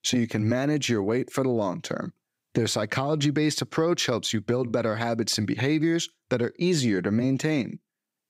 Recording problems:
none

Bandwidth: 15.5 kHz